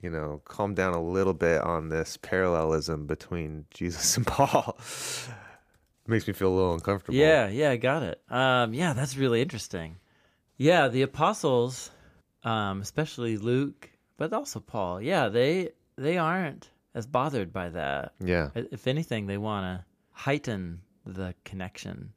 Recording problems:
none

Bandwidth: 15 kHz